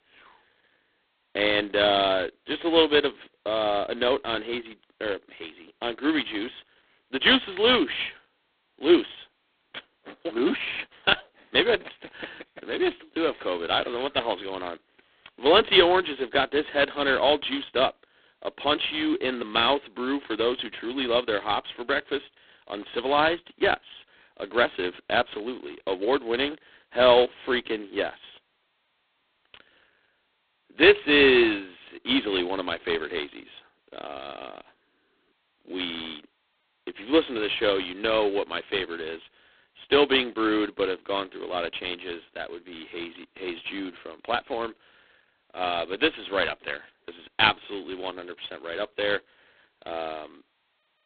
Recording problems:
phone-call audio; poor line

